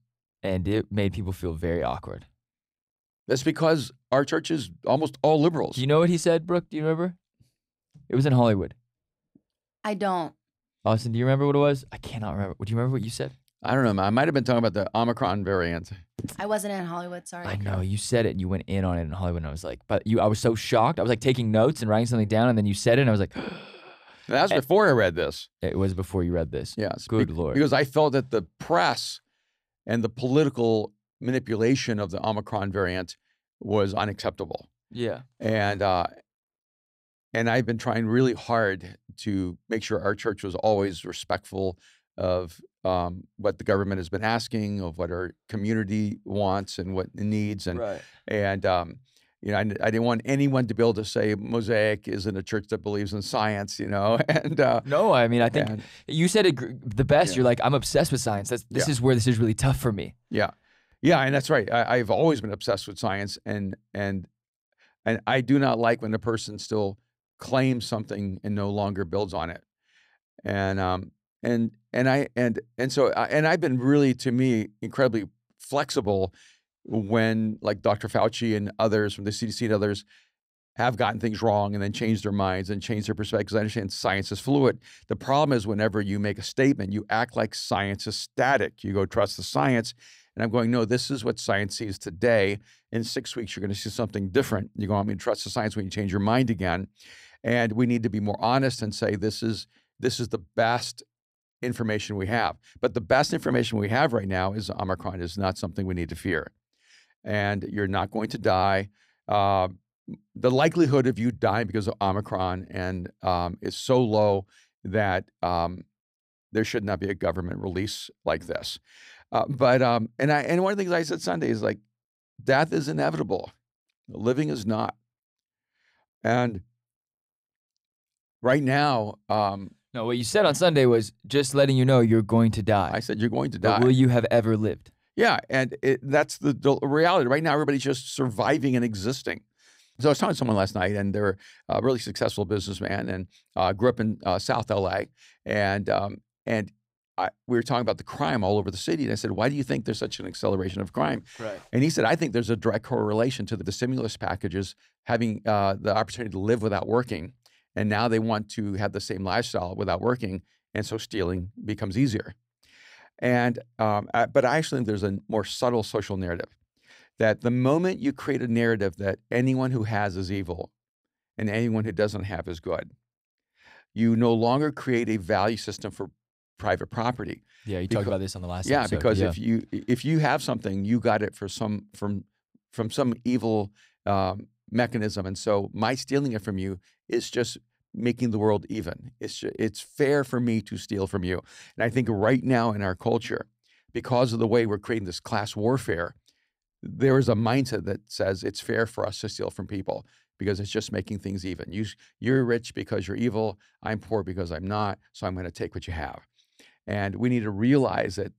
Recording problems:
none

